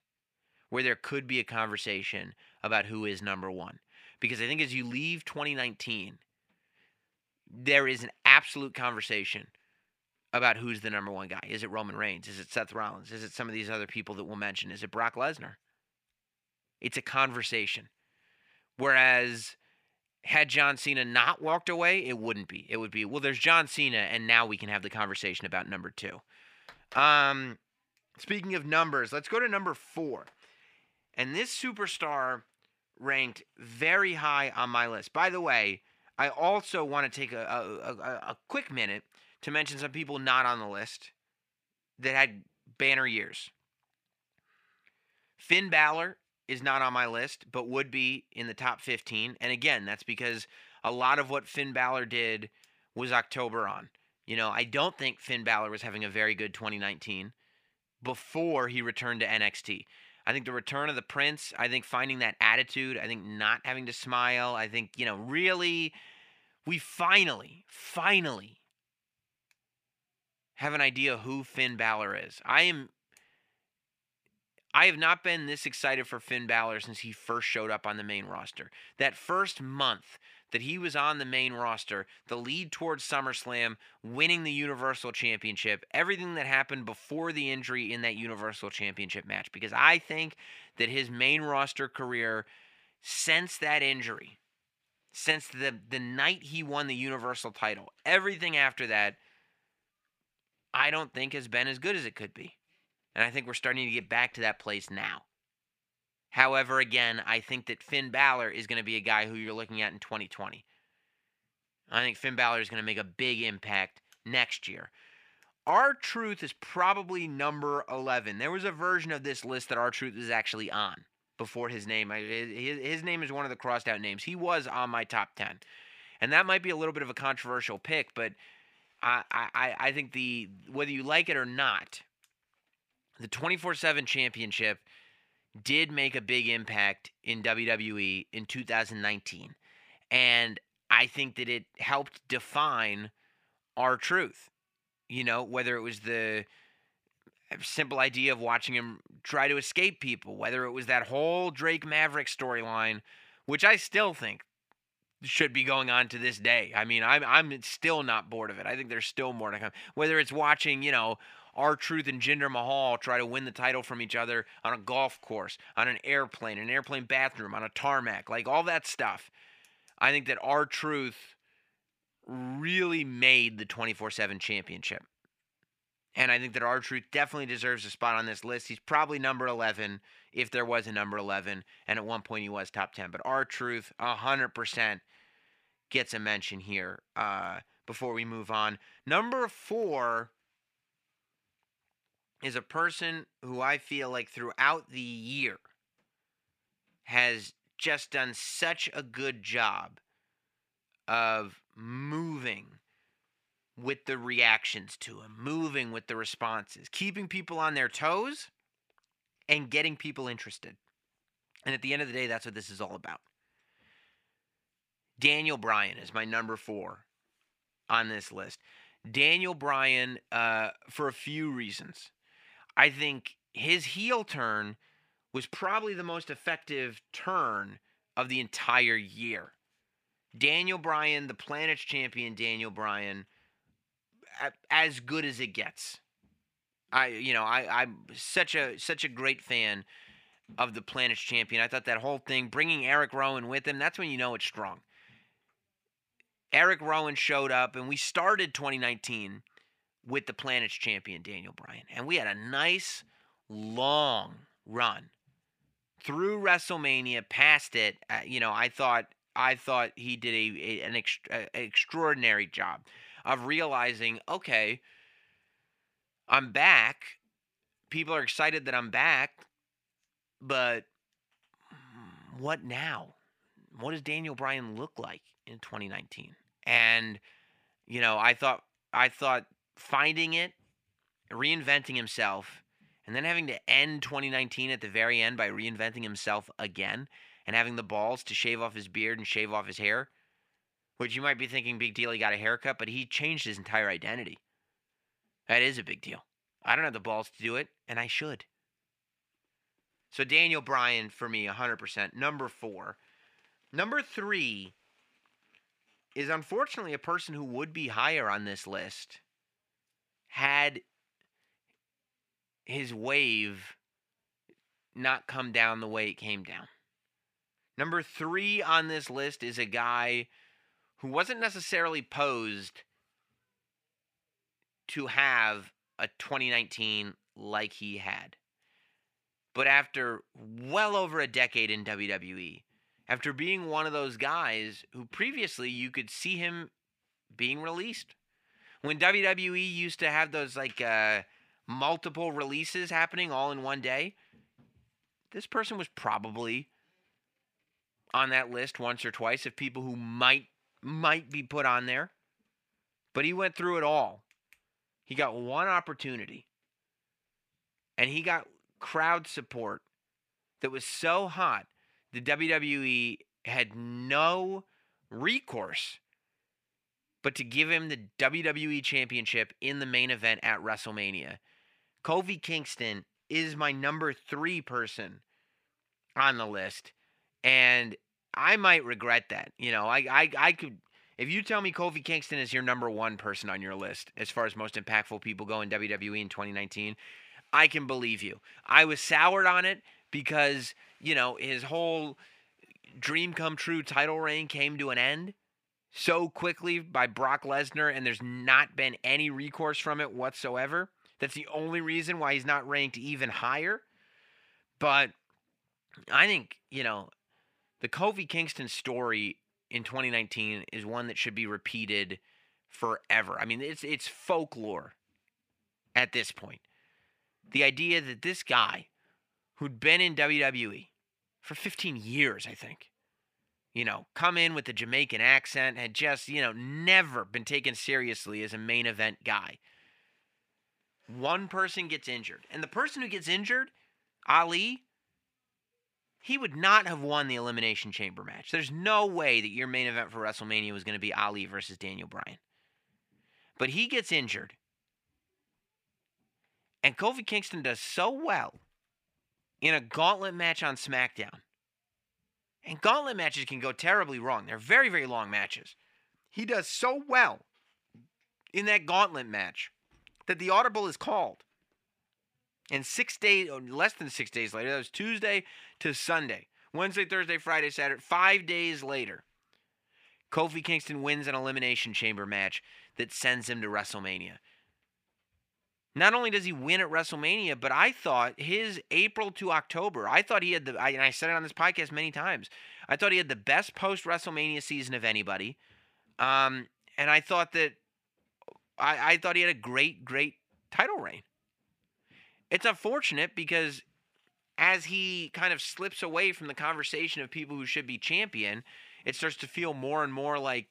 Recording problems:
thin; somewhat; fading below 350 Hz

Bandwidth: 15 kHz